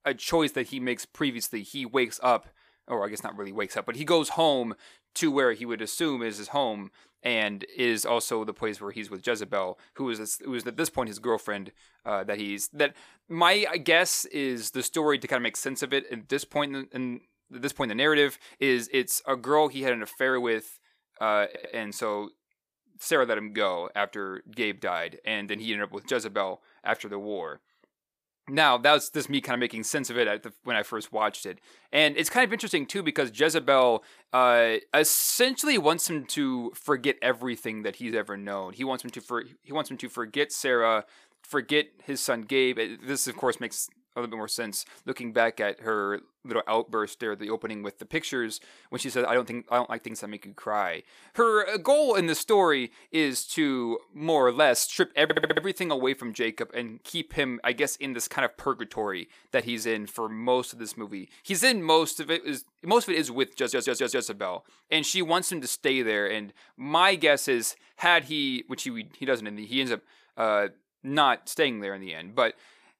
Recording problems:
audio stuttering; at 21 s, at 55 s and at 1:04

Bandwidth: 15 kHz